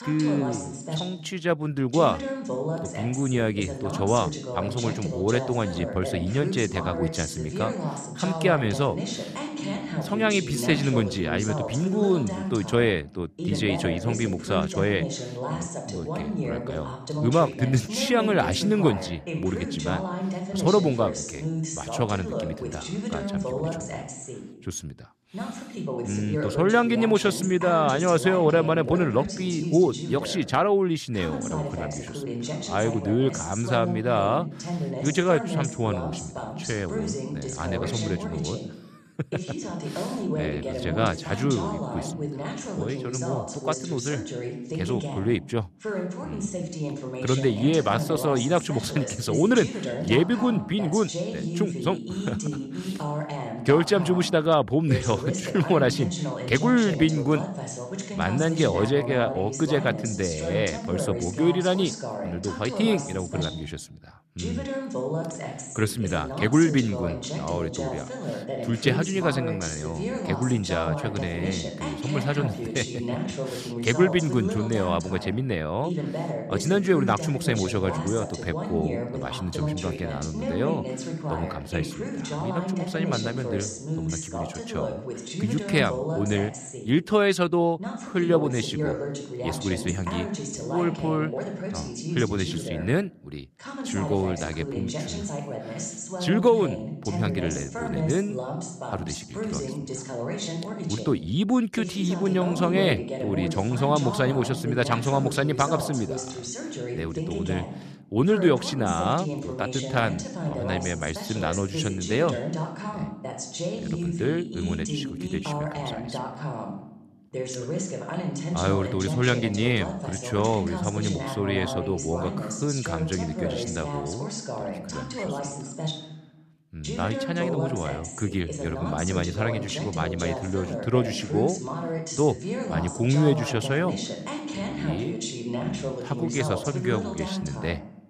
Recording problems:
voice in the background; loud; throughout; 5 dB below the speech

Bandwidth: 14.5 kHz